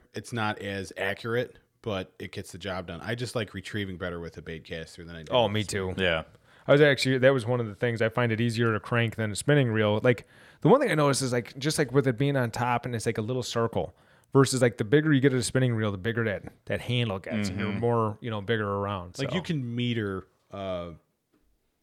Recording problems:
none

